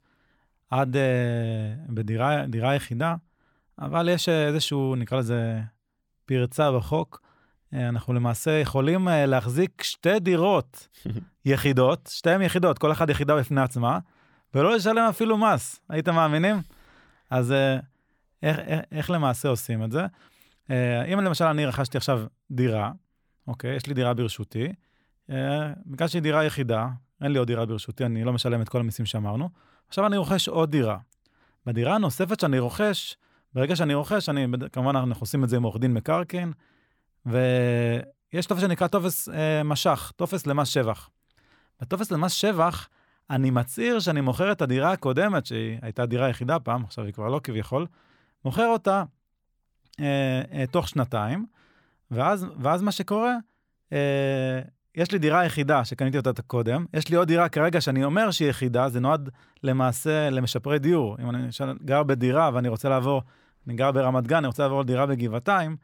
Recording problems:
none

